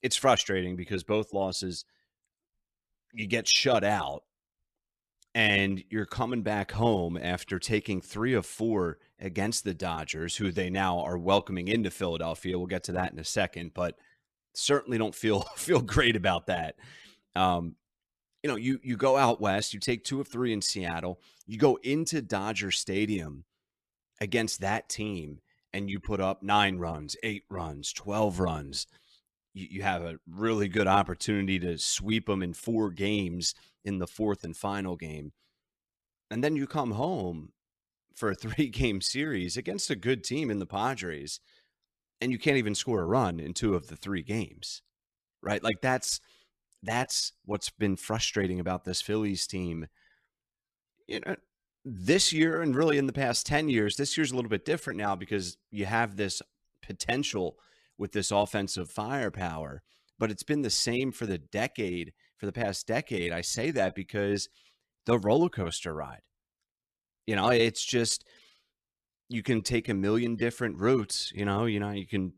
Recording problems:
none

